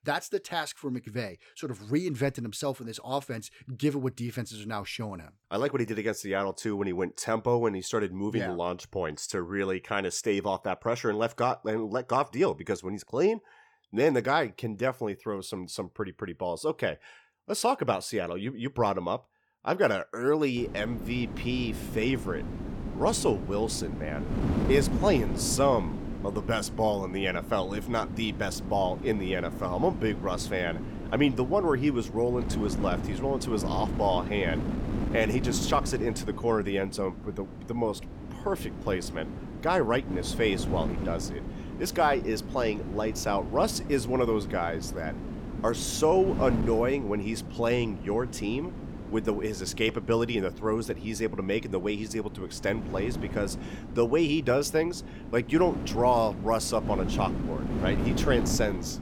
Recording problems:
wind noise on the microphone; occasional gusts; from 21 s on; 10 dB below the speech

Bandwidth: 18 kHz